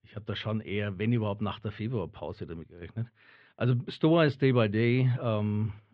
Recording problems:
muffled; very; fading above 3.5 kHz

